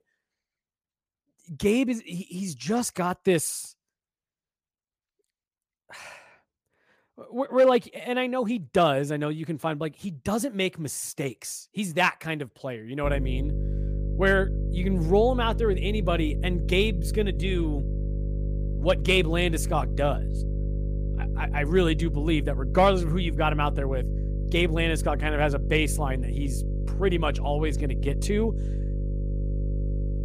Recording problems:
electrical hum; noticeable; from 13 s on; 50 Hz, 15 dB below the speech

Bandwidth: 15 kHz